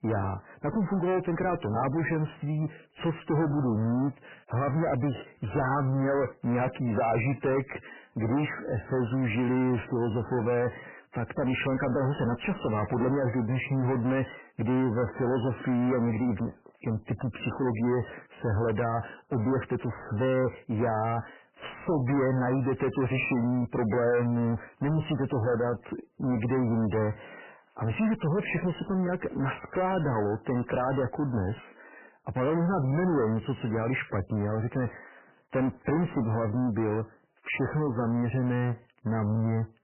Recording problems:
distortion; heavy; 7 dB below the speech
garbled, watery; badly; nothing above 3 kHz

